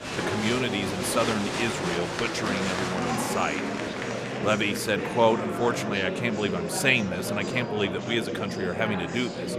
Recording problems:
murmuring crowd; loud; throughout; 3 dB below the speech

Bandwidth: 14.5 kHz